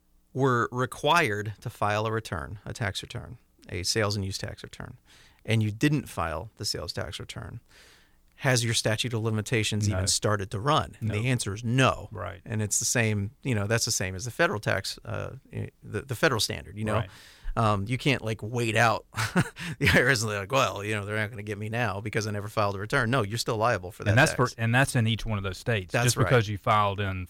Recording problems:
none

